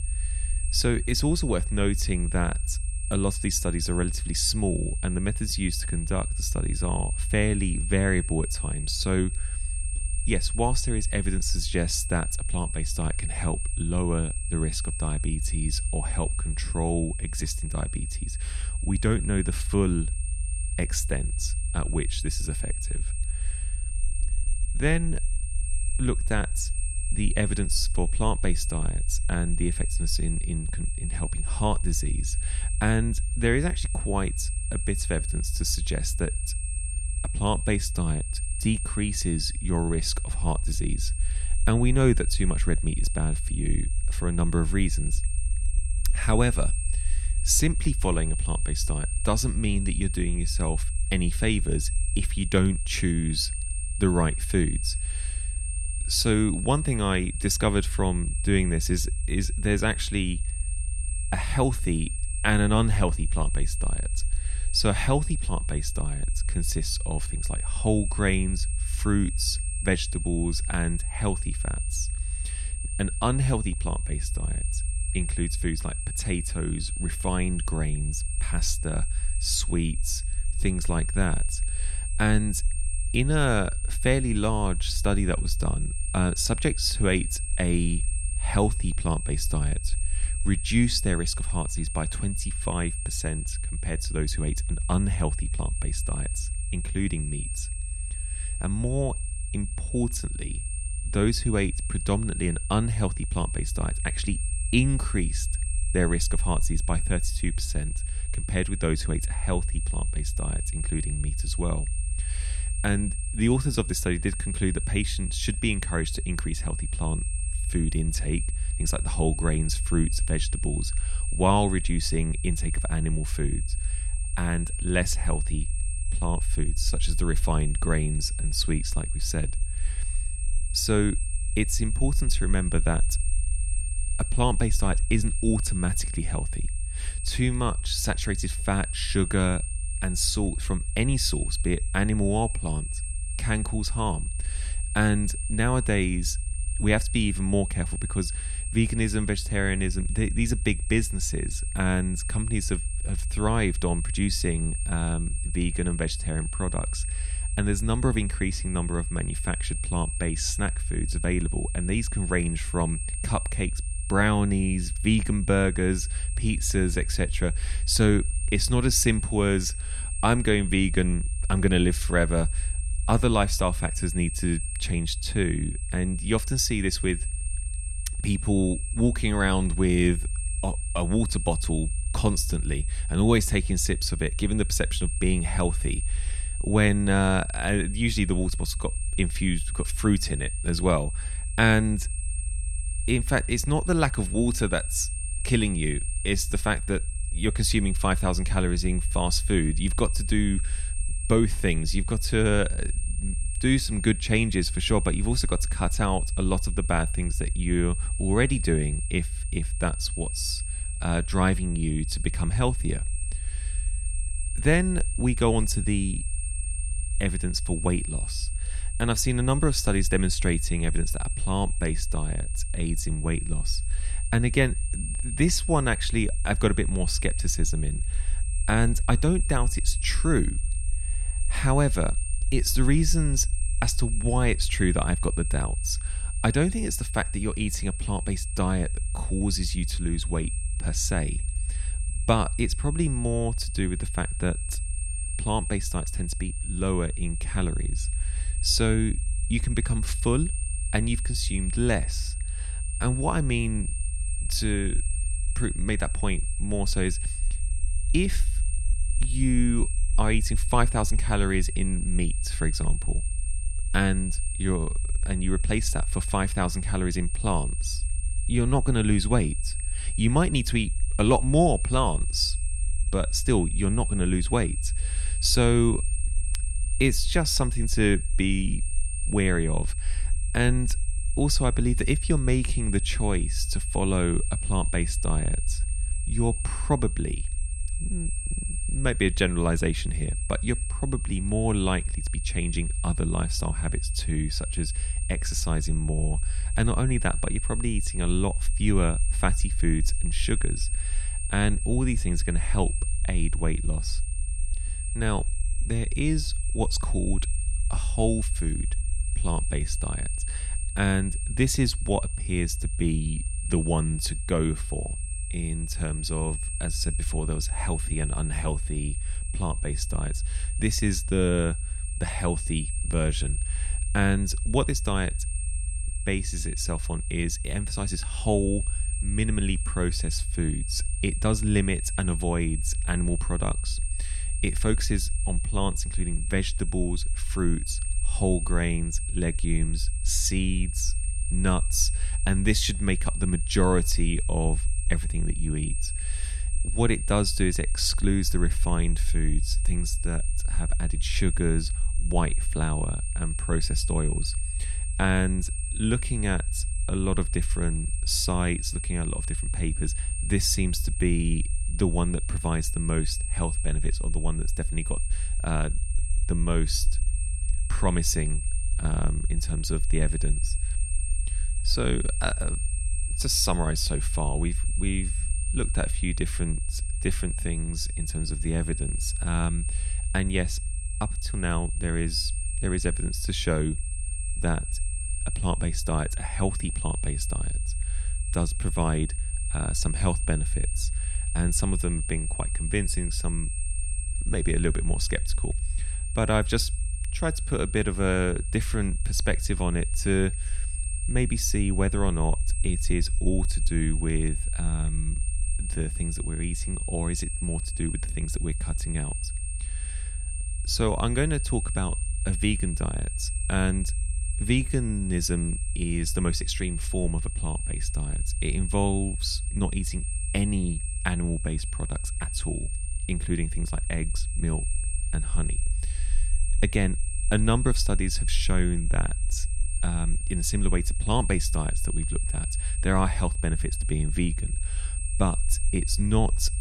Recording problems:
high-pitched whine; loud; throughout; 8.5 kHz, 8 dB below the speech
low rumble; faint; throughout; 25 dB below the speech

